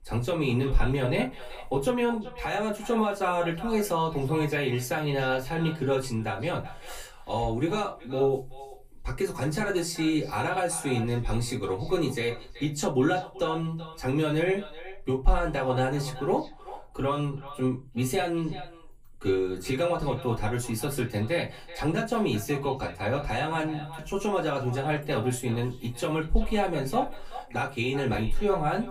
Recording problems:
off-mic speech; far
echo of what is said; noticeable; throughout; 380 ms later, 15 dB below the speech
room echo; very slight; dies away in 0.2 s

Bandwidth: 15 kHz